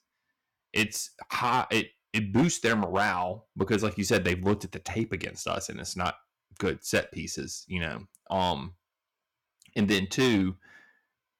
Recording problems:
distortion; slight; 4% of the sound clipped

